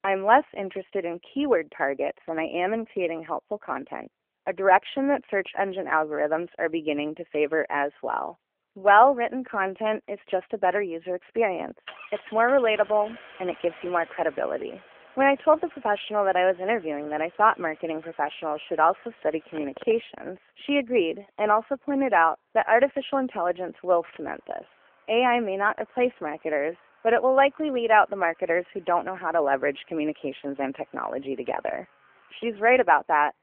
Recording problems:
phone-call audio; nothing above 3 kHz
traffic noise; faint; from 7.5 s on; 25 dB below the speech

